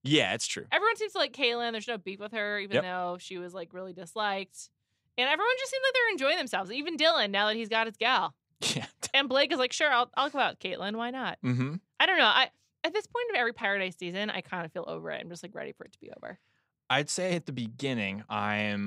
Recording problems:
abrupt cut into speech; at the end

